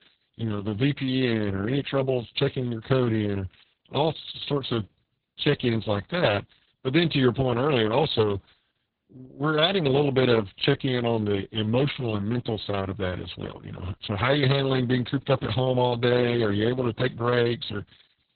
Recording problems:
garbled, watery; badly; nothing above 4 kHz

